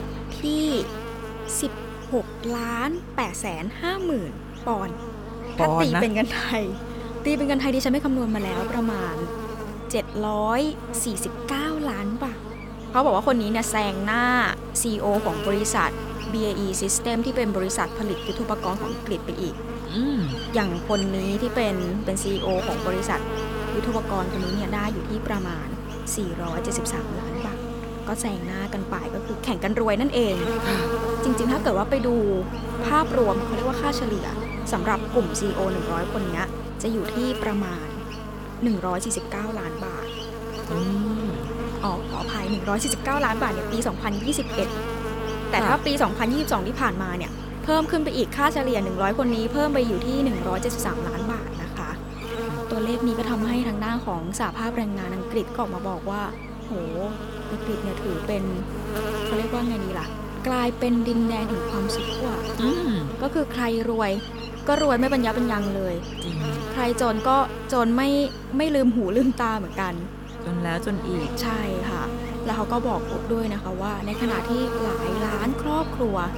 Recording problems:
electrical hum; loud; throughout; 50 Hz, 6 dB below the speech

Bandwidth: 17 kHz